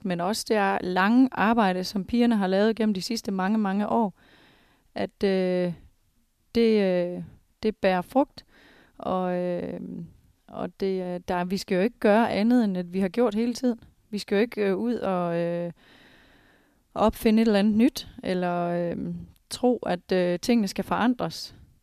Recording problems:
none

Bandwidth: 14.5 kHz